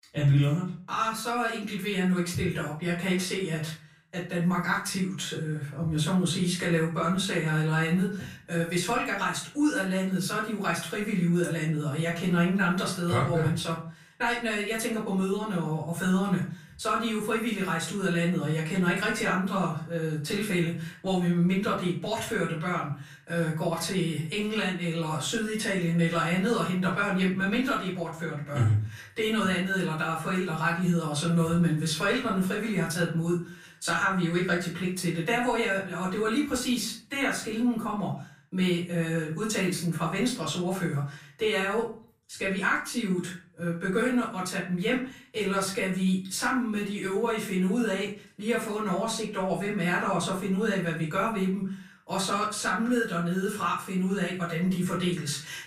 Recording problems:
off-mic speech; far
room echo; slight; dies away in 0.4 s

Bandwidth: 14.5 kHz